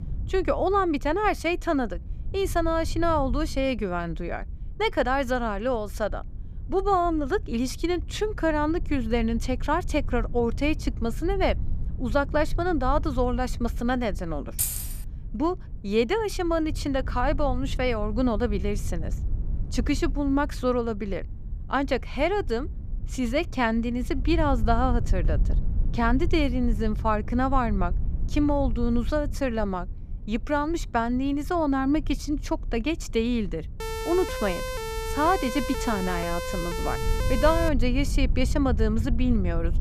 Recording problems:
low rumble; faint; throughout; 20 dB below the speech
jangling keys; loud; at 15 s; peak level with the speech
siren; noticeable; from 34 to 38 s; peak 5 dB below the speech

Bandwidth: 14.5 kHz